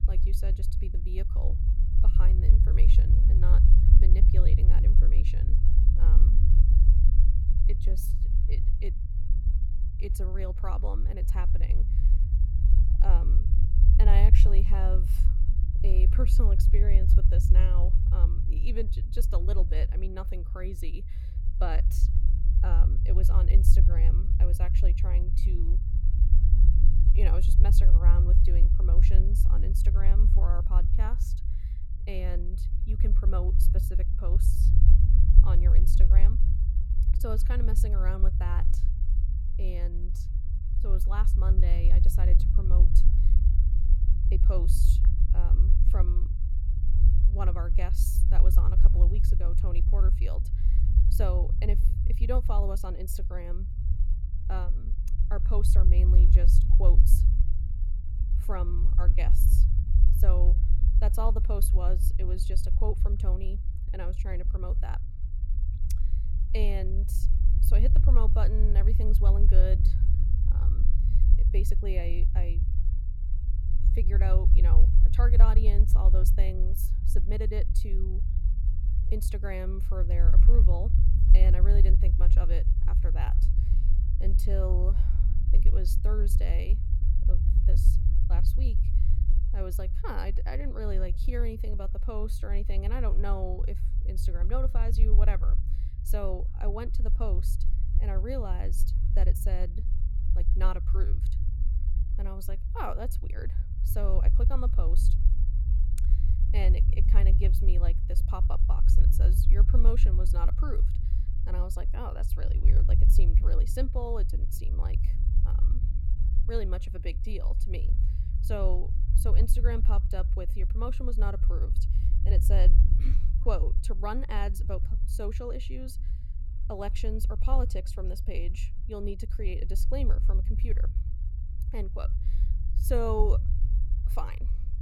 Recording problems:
low rumble; loud; throughout; 6 dB below the speech

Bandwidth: 18.5 kHz